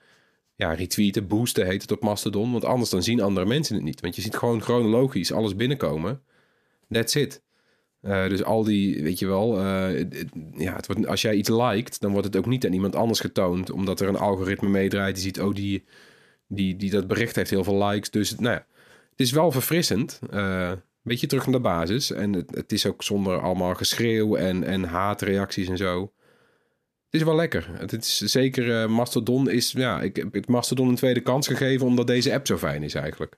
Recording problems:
none

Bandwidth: 14.5 kHz